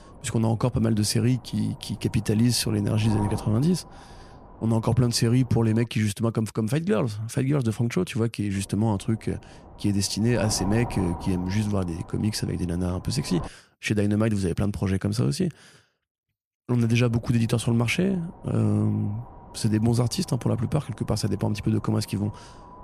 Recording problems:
wind noise on the microphone; occasional gusts; until 6 s, from 8.5 to 13 s and from 17 s on; 15 dB below the speech

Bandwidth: 14.5 kHz